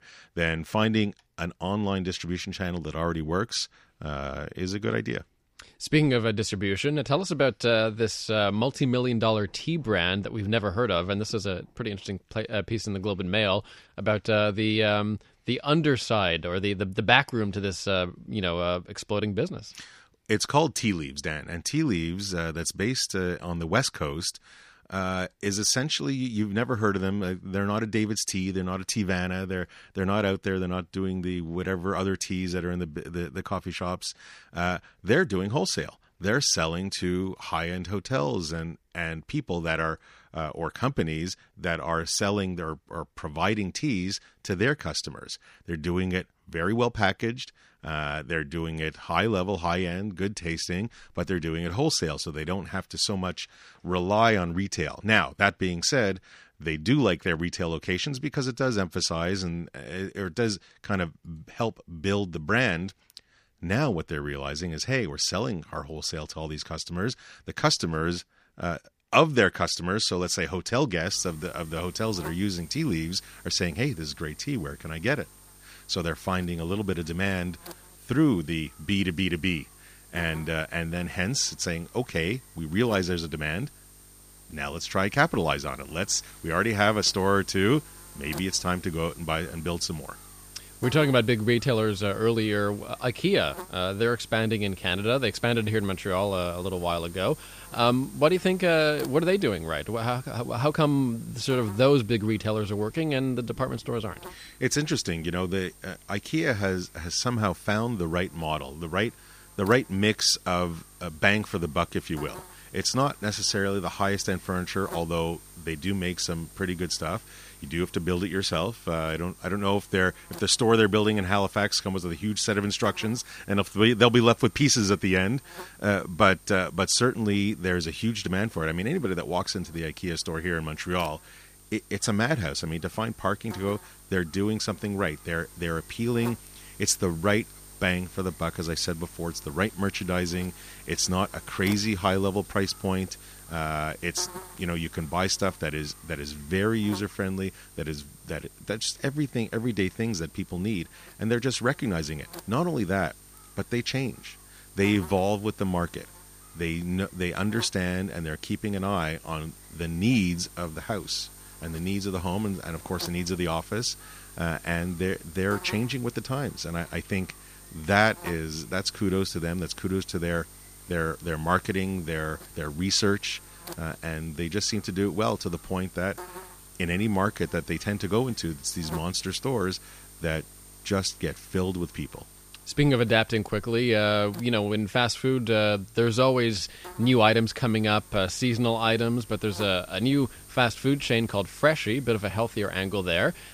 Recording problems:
electrical hum; faint; from 1:11 on; 50 Hz, 20 dB below the speech

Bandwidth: 15 kHz